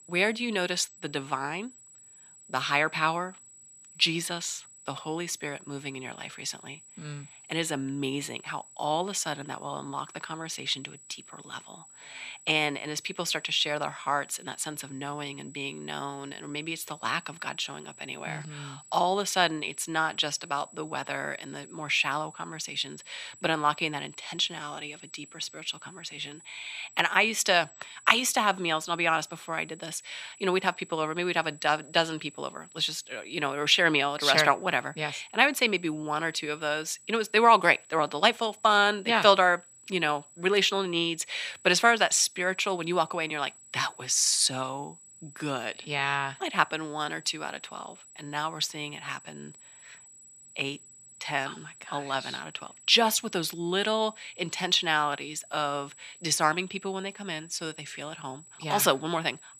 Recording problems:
thin; somewhat; fading below 950 Hz
high-pitched whine; faint; throughout; 8 kHz, 20 dB below the speech

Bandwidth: 14.5 kHz